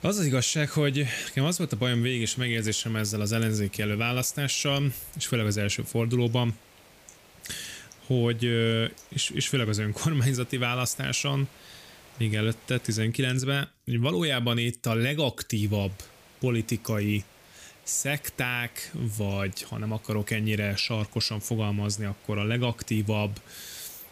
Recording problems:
hiss; faint; until 13 s and from 16 s on; 25 dB below the speech

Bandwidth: 15 kHz